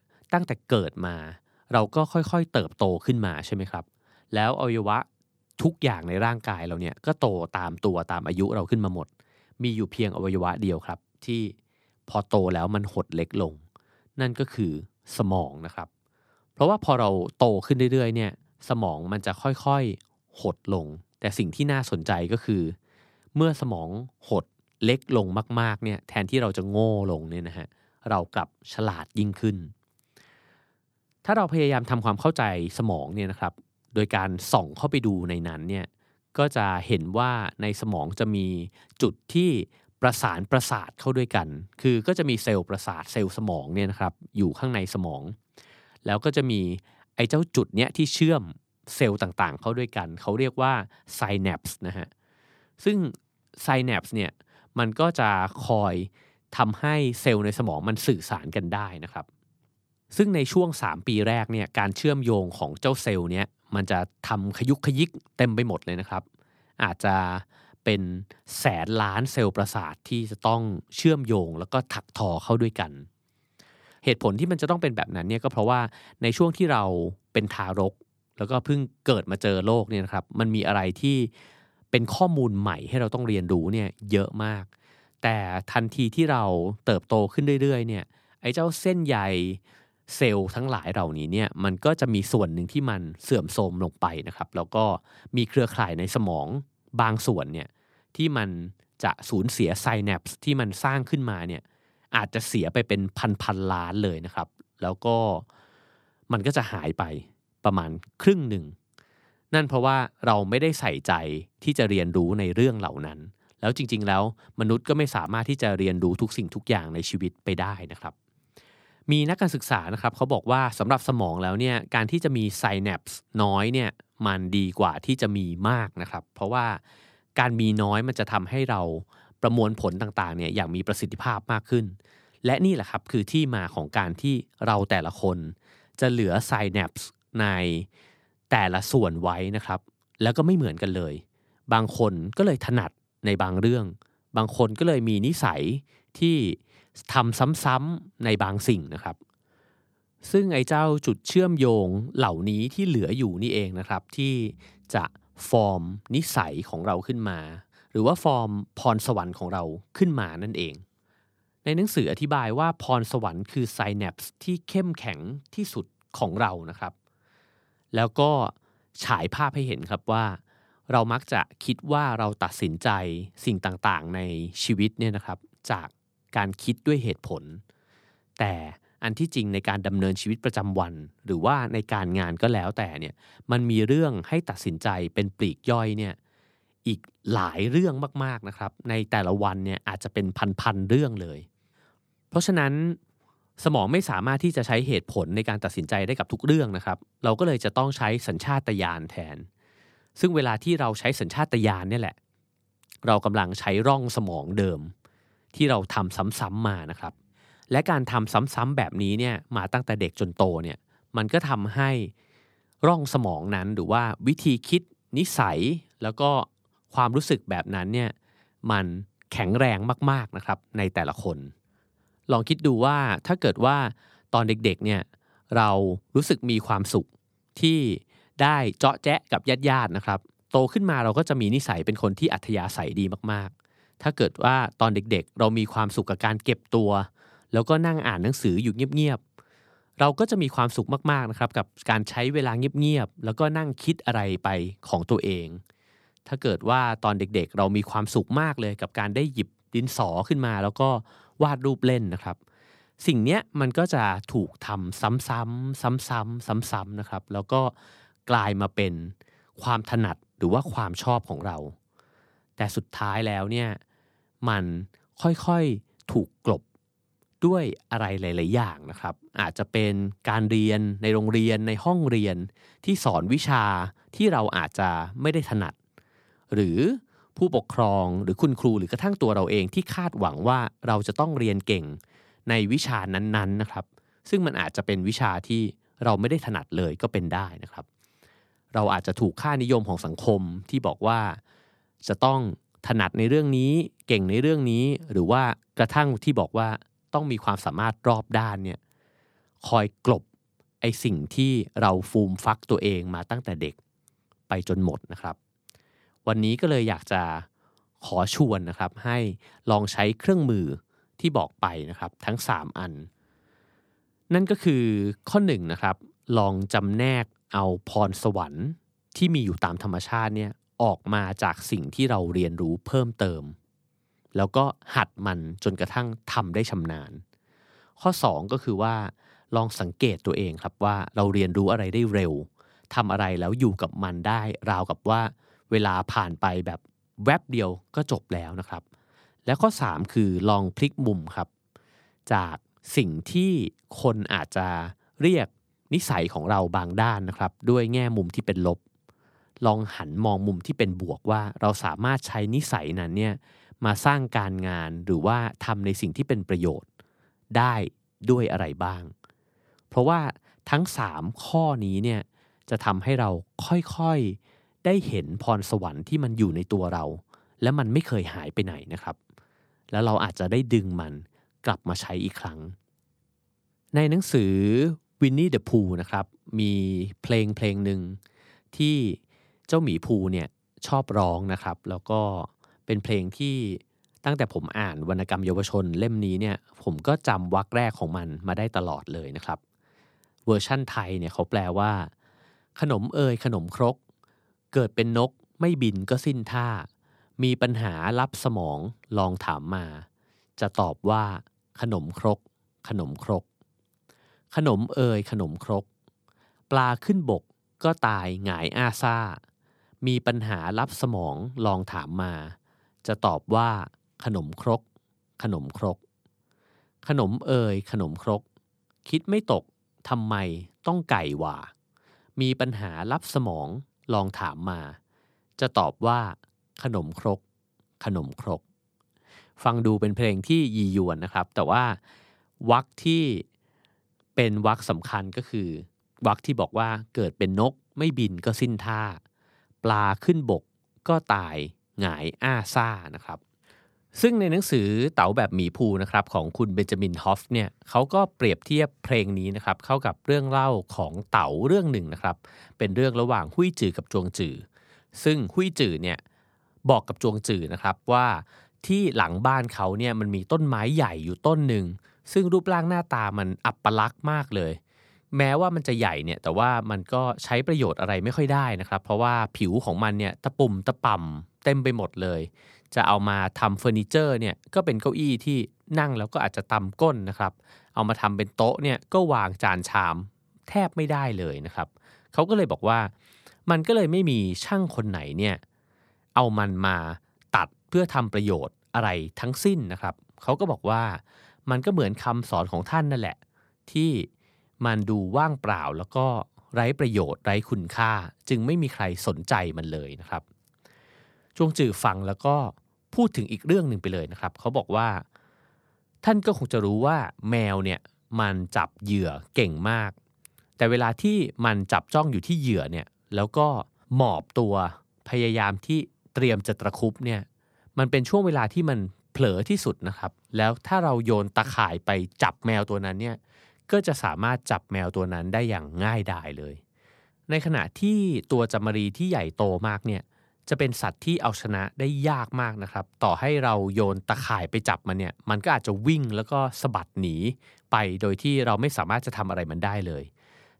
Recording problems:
none

